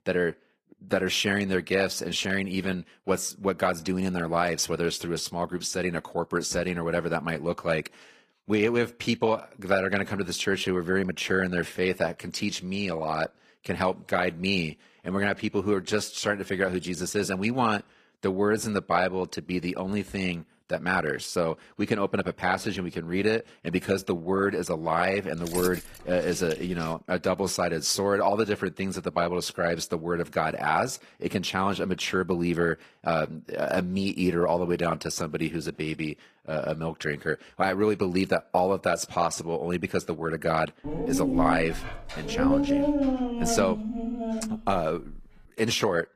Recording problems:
garbled, watery; slightly; nothing above 14.5 kHz
jangling keys; noticeable; from 25 to 27 s; peak 7 dB below the speech
dog barking; loud; from 41 to 45 s; peak 5 dB above the speech

